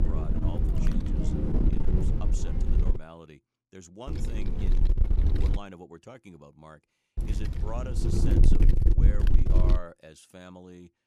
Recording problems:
wind noise on the microphone; heavy; until 3 s, from 4 to 5.5 s and from 7 to 10 s; 5 dB above the speech

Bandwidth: 14.5 kHz